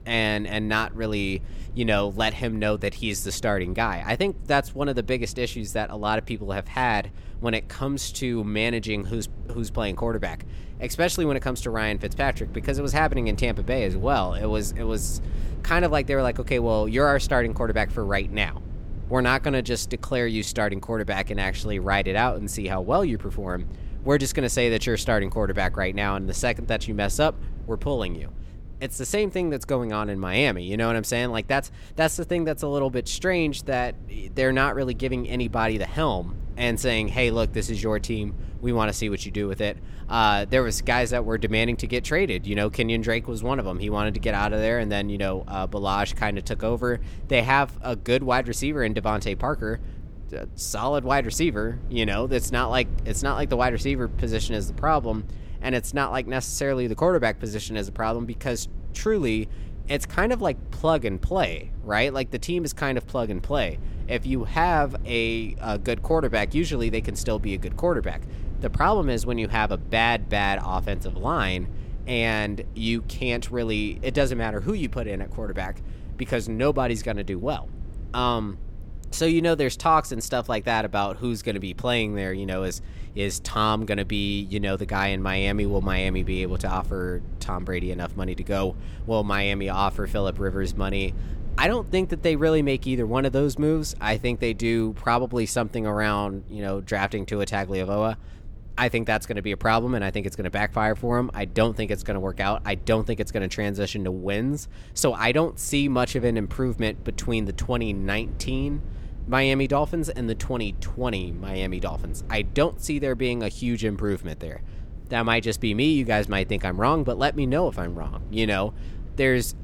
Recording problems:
low rumble; faint; throughout; 25 dB below the speech

